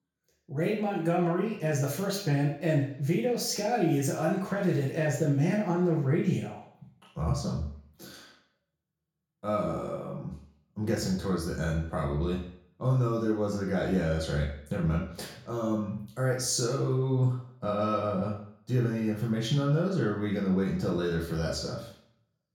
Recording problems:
off-mic speech; far
room echo; noticeable; dies away in 0.5 s

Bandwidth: 18 kHz